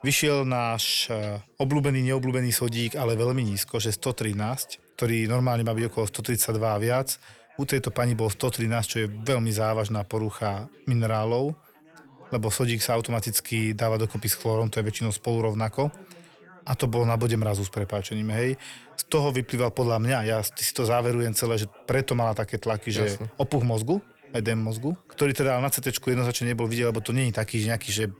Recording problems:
background chatter; faint; throughout; 4 voices, 25 dB below the speech

